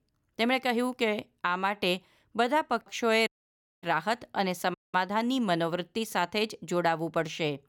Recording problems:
audio cutting out; at 3.5 s for 0.5 s and at 4.5 s

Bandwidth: 18 kHz